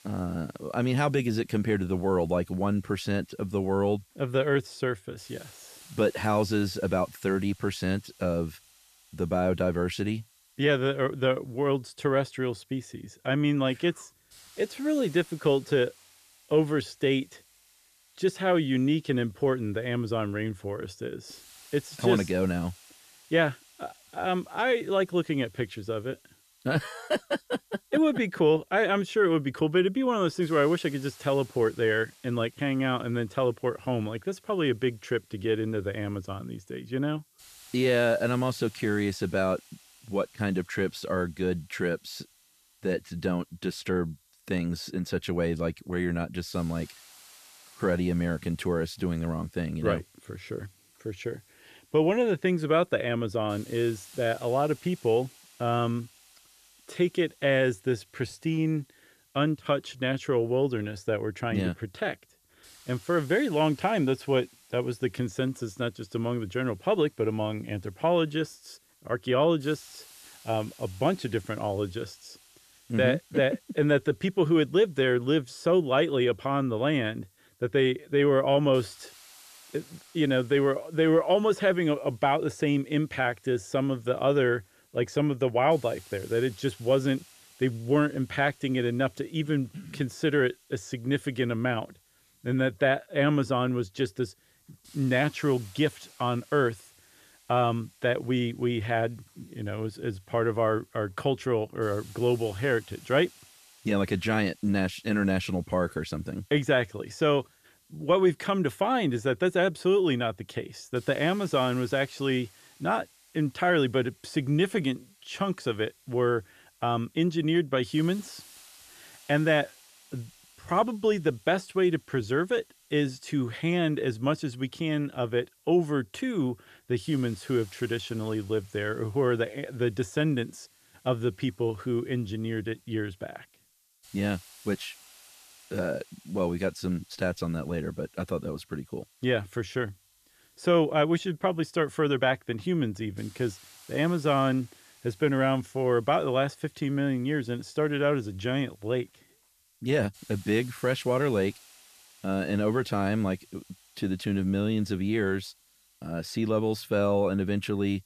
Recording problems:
hiss; faint; throughout; 25 dB below the speech

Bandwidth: 14.5 kHz